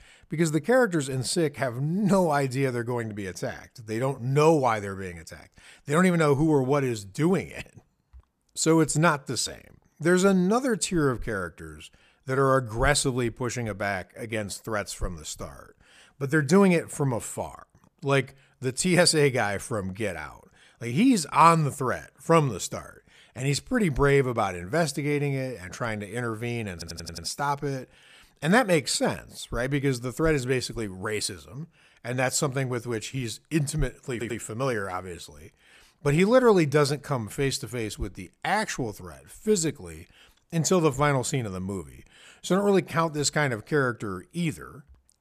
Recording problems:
audio stuttering; at 27 s and at 34 s

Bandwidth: 14.5 kHz